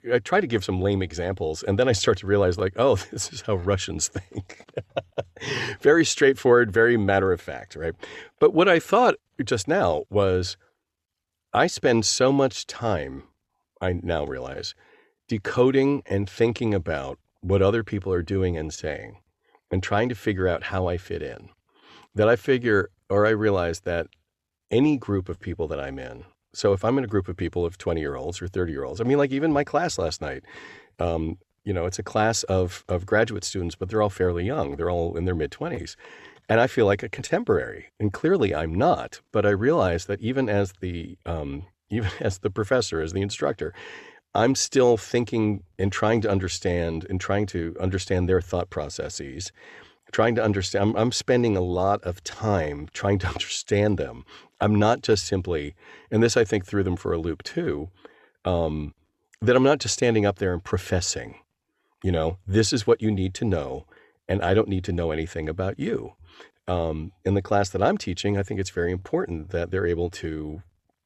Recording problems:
none

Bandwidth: 13.5 kHz